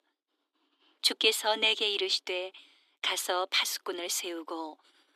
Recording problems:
thin; very; fading below 300 Hz

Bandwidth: 14.5 kHz